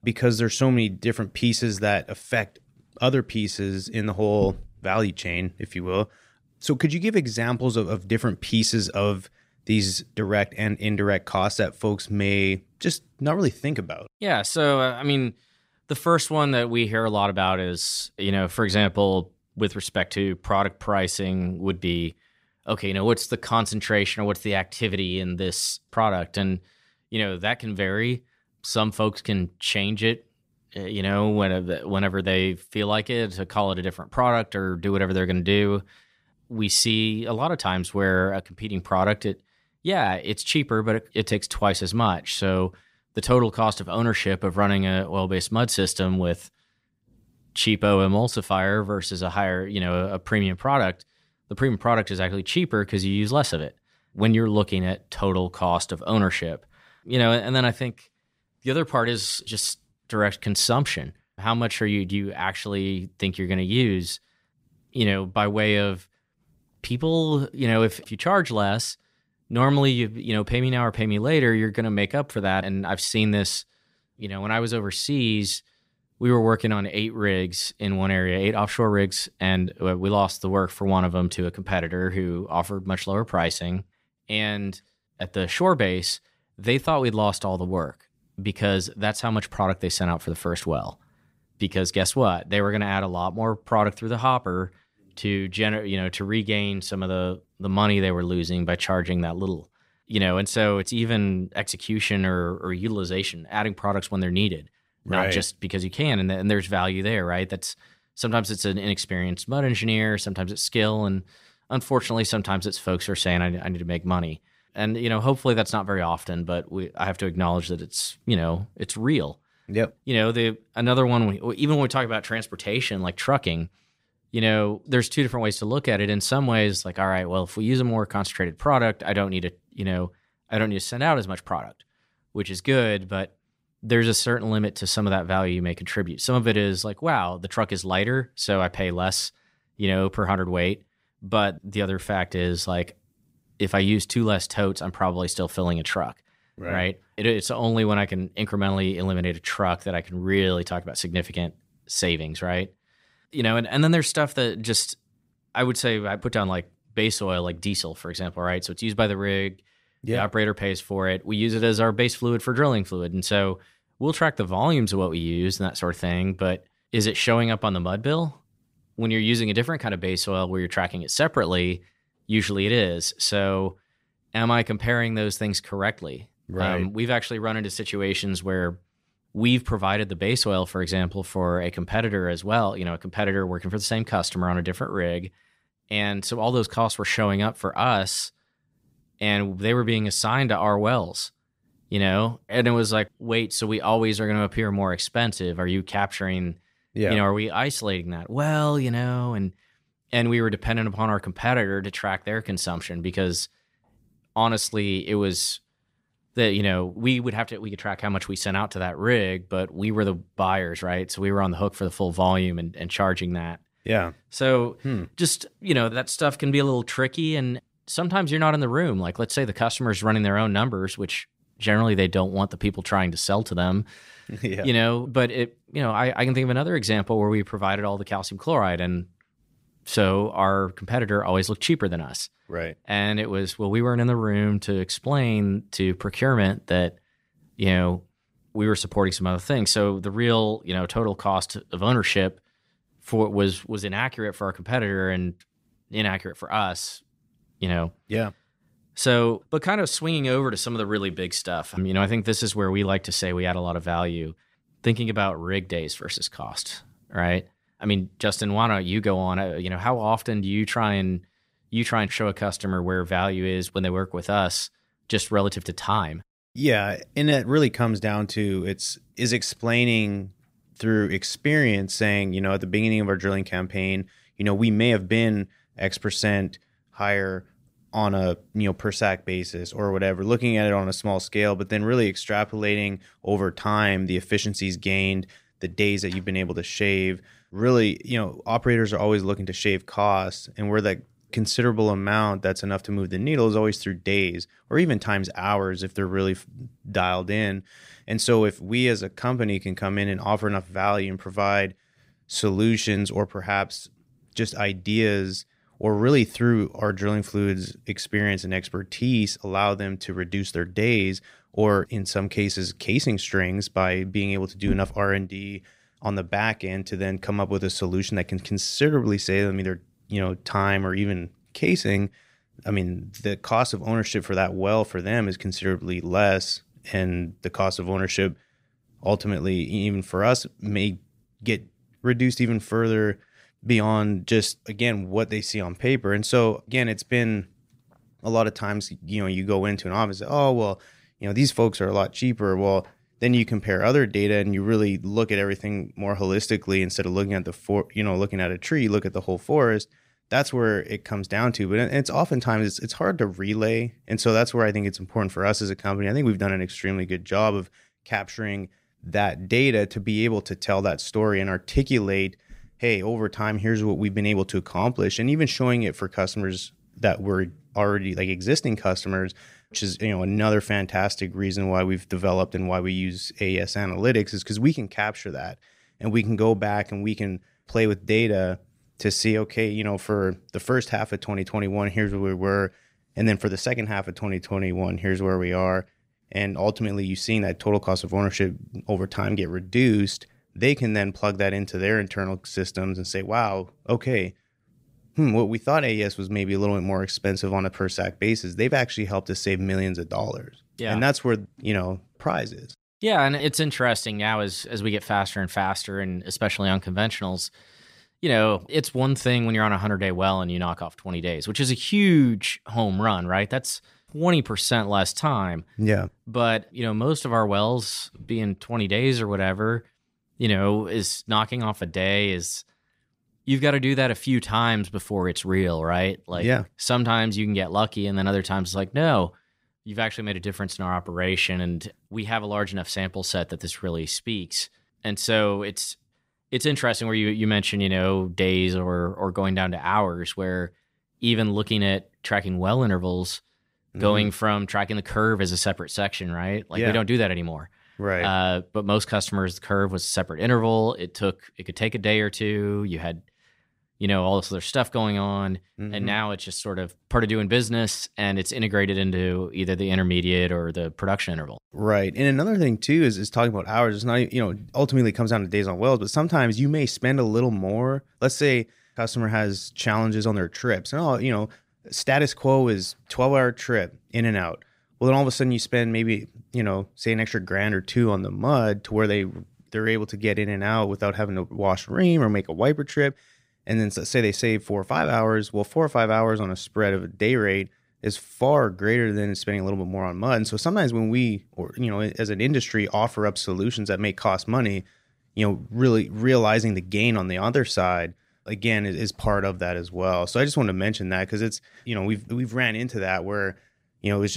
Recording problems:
abrupt cut into speech; at the end

